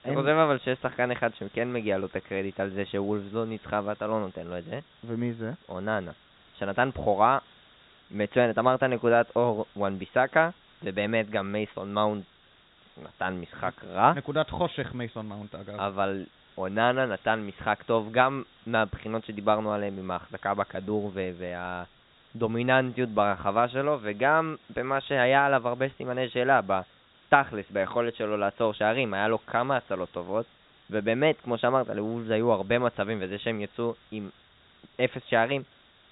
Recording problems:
high frequencies cut off; severe; nothing above 4 kHz
hiss; faint; throughout; 30 dB below the speech

